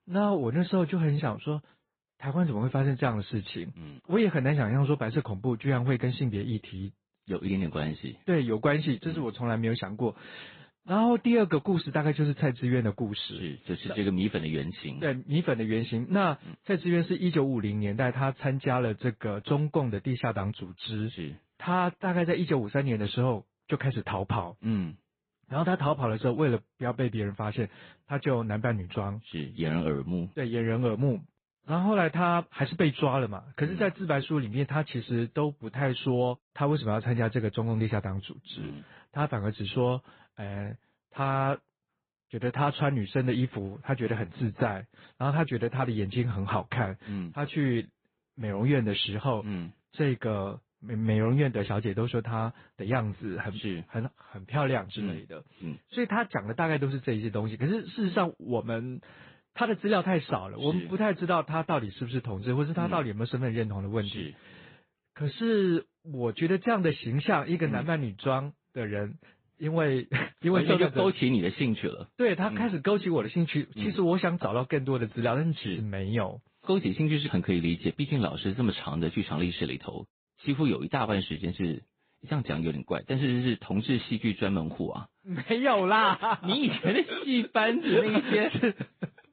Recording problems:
high frequencies cut off; severe; nothing above 4 kHz
garbled, watery; slightly

